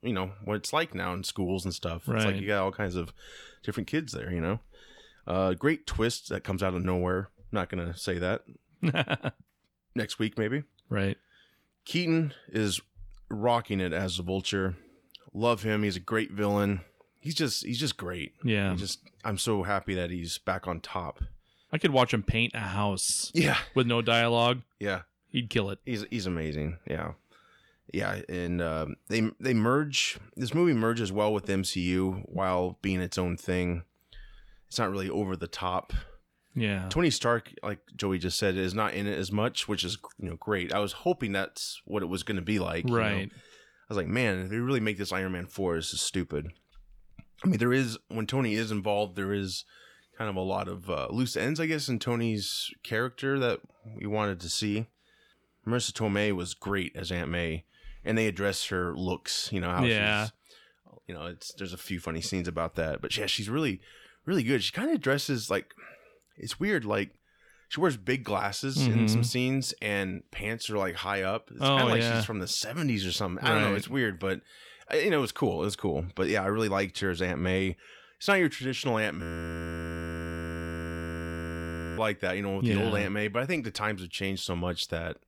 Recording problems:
audio freezing; at 1:19 for 3 s

